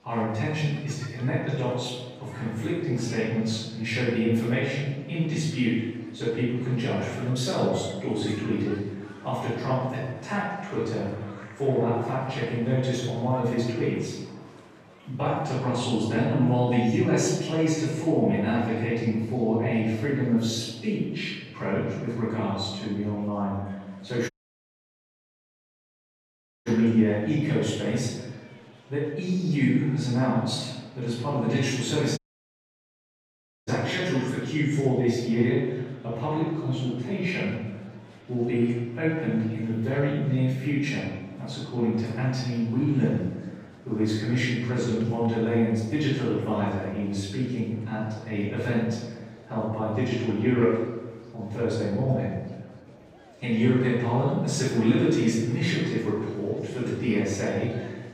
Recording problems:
room echo; strong; dies away in 1.1 s
off-mic speech; far
murmuring crowd; faint; throughout; 25 dB below the speech
audio cutting out; at 24 s for 2.5 s and at 32 s for 1.5 s

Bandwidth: 15 kHz